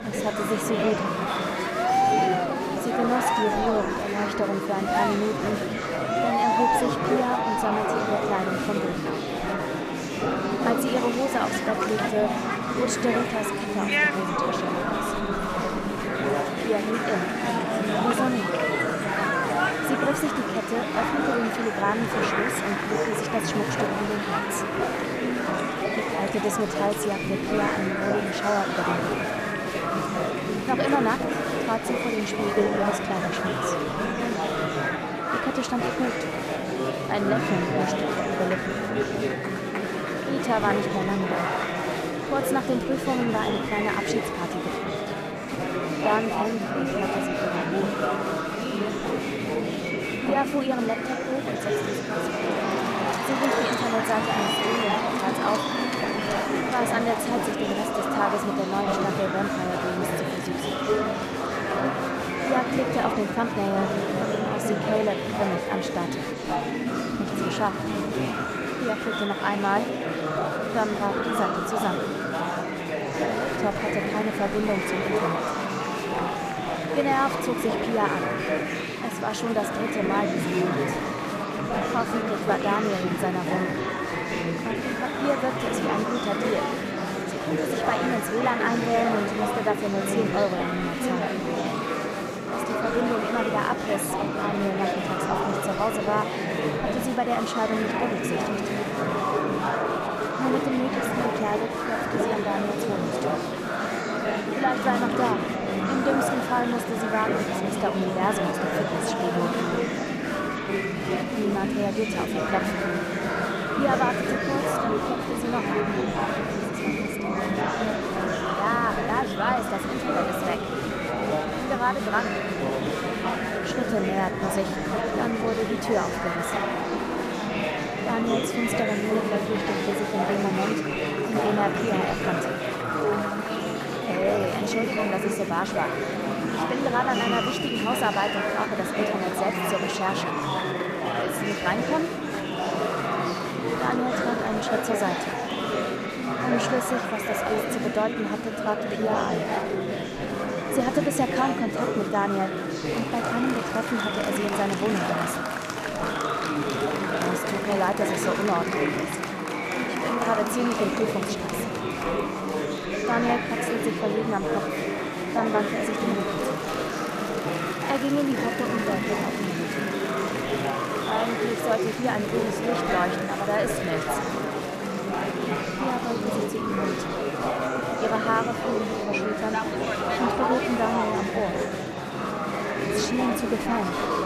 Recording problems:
murmuring crowd; very loud; throughout; 2 dB above the speech

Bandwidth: 14.5 kHz